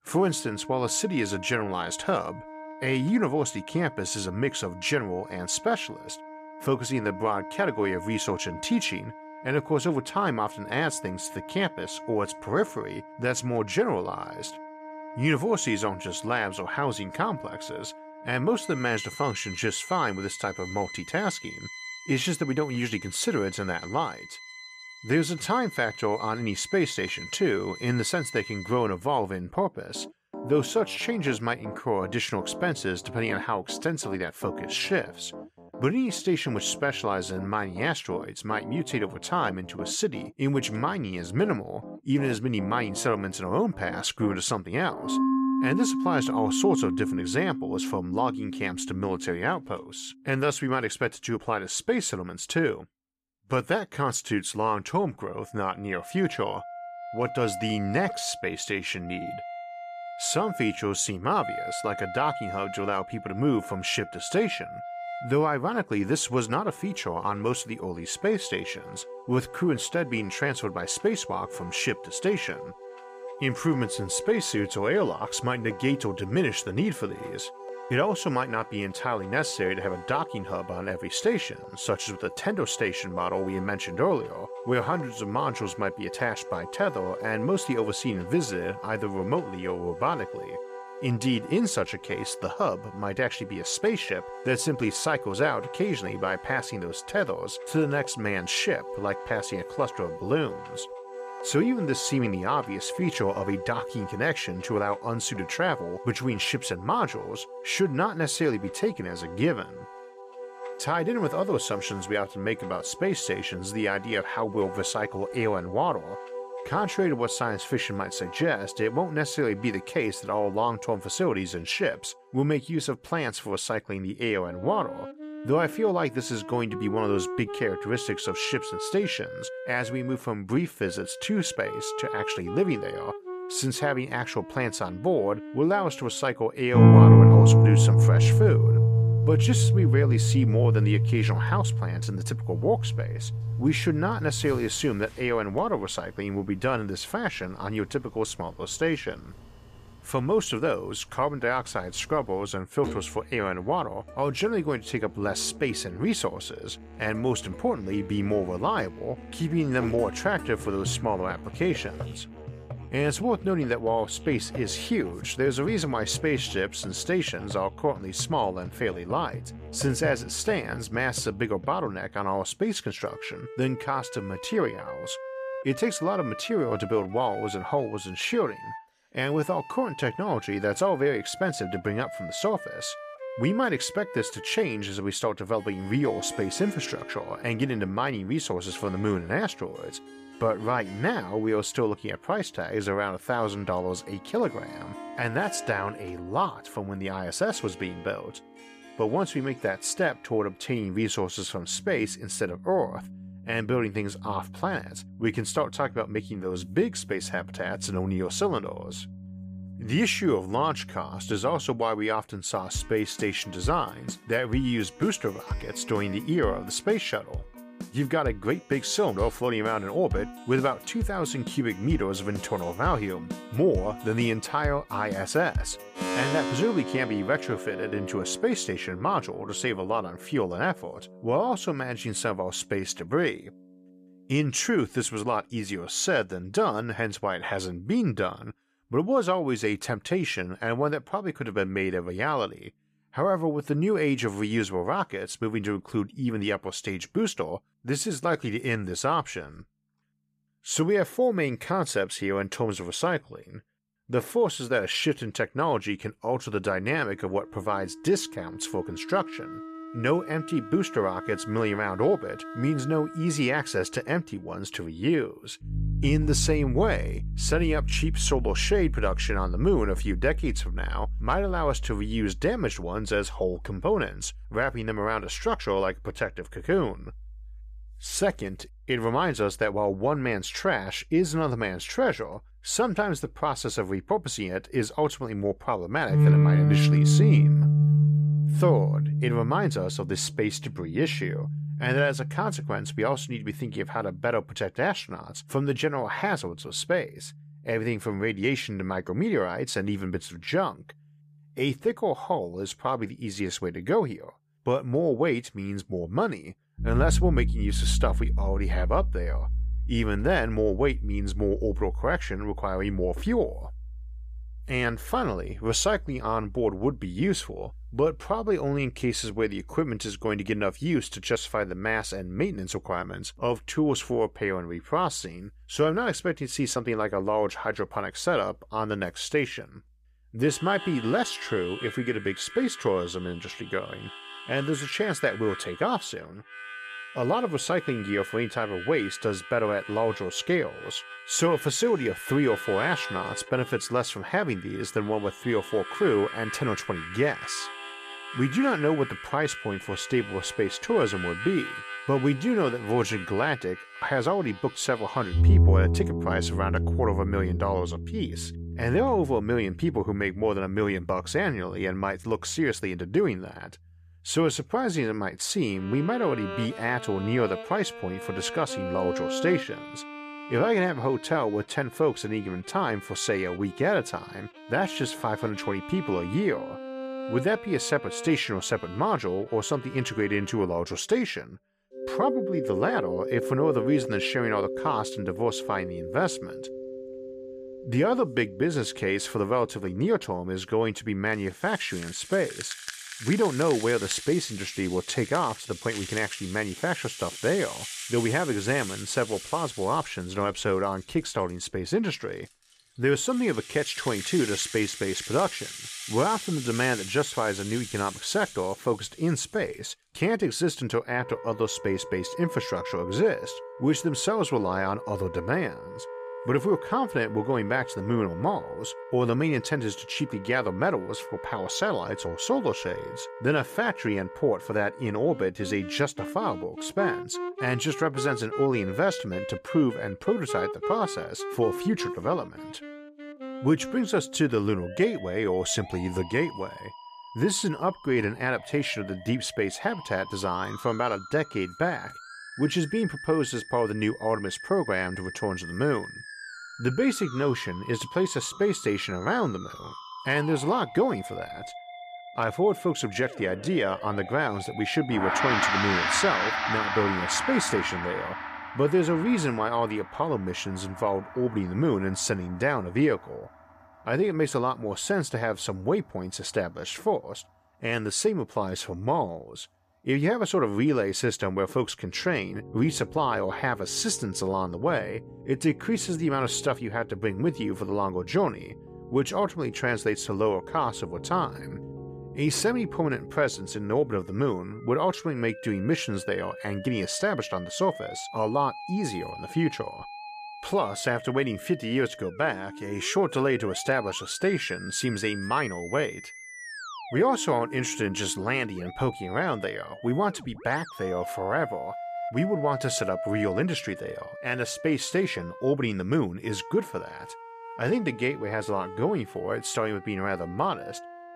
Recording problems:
background music; loud; throughout; 5 dB below the speech

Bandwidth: 15 kHz